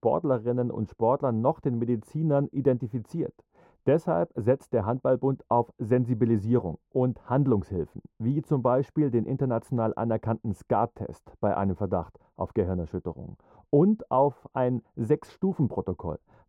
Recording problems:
muffled; very; fading above 1.5 kHz

